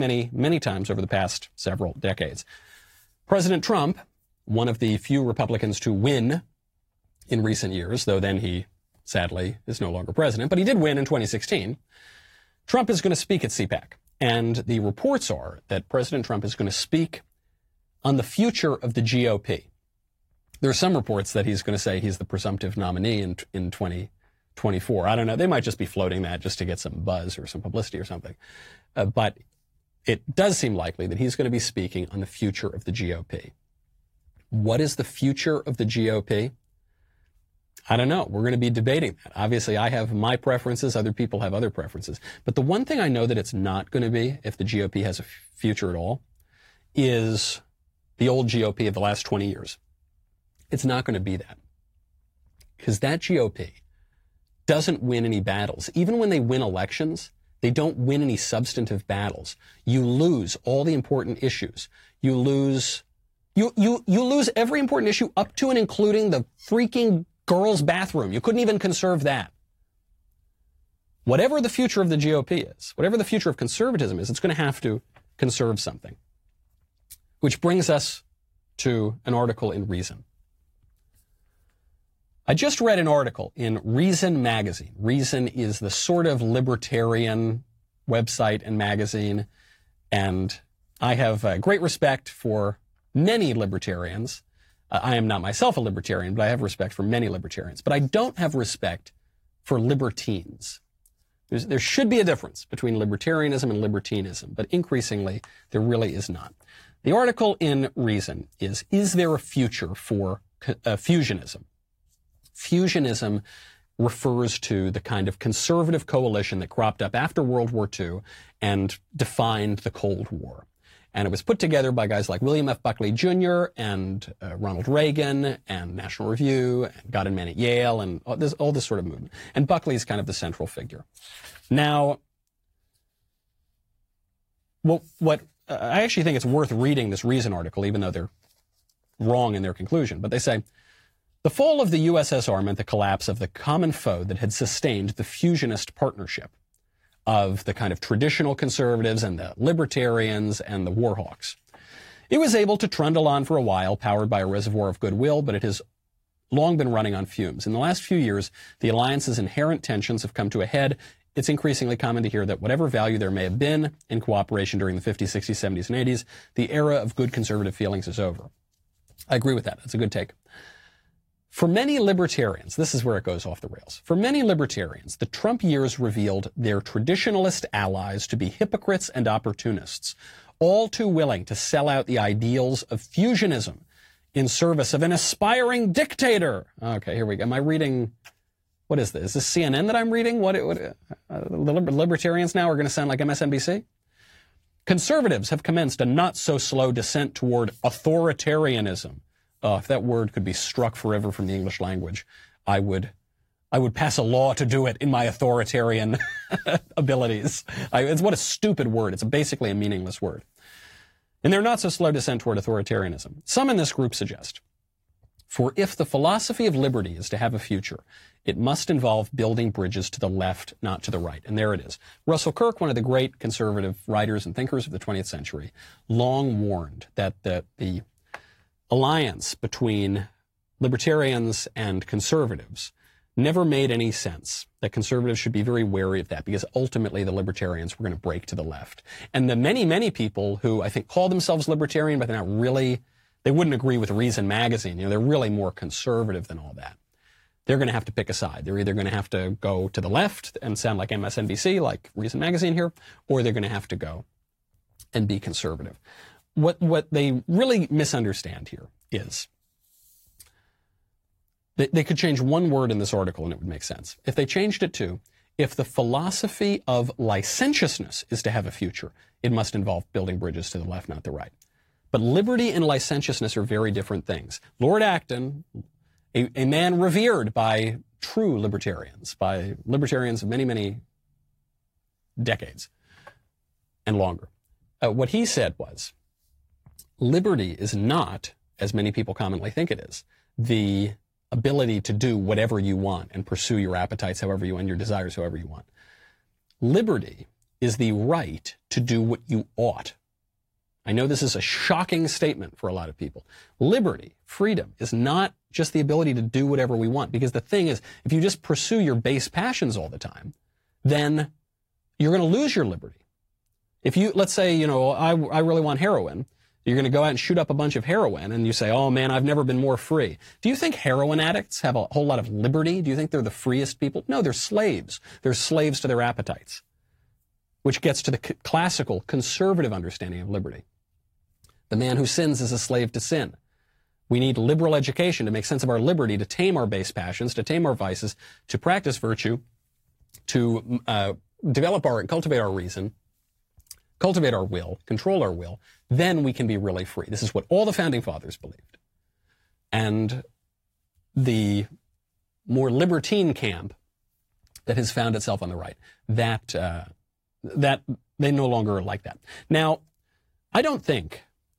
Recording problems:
garbled, watery; slightly; nothing above 16 kHz
abrupt cut into speech; at the start

